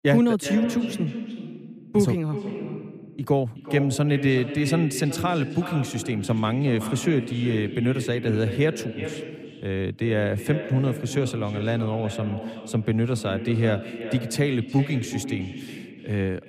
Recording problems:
echo of what is said; strong; throughout; 370 ms later, 9 dB below the speech

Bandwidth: 15 kHz